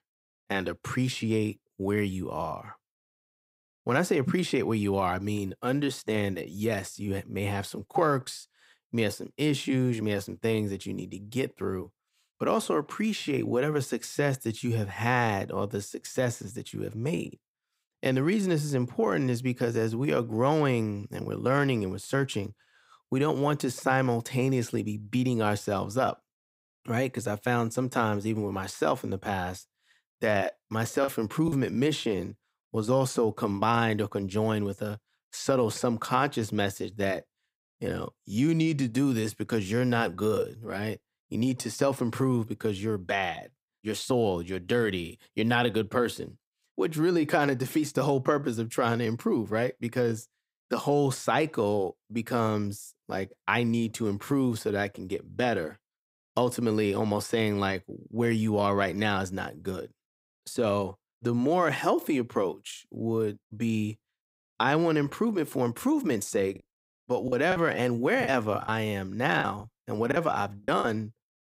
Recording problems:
choppy; very; at 31 s and from 1:07 to 1:11; 7% of the speech affected

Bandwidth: 15.5 kHz